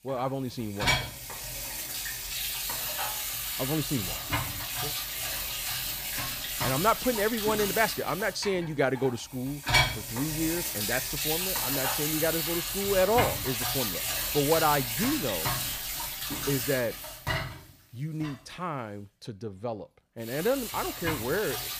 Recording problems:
household noises; very loud; throughout; 1 dB above the speech

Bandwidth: 15 kHz